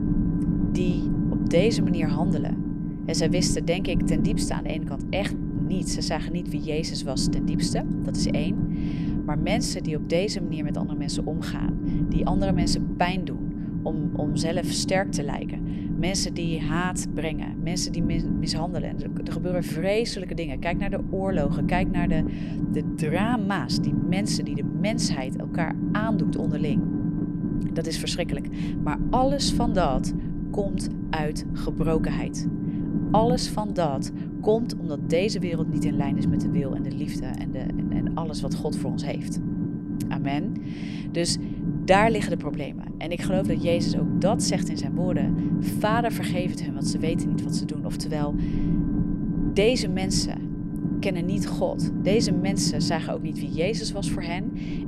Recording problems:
low rumble; loud; throughout; 5 dB below the speech

